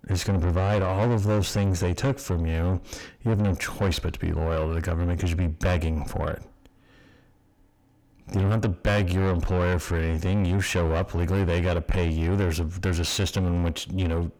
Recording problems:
distortion; heavy; 7 dB below the speech

